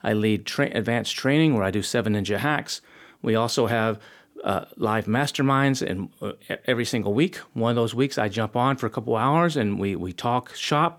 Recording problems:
none

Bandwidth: 19 kHz